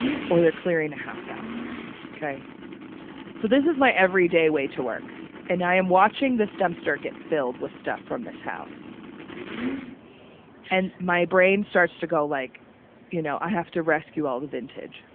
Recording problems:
phone-call audio
traffic noise; noticeable; throughout; 15 dB below the speech

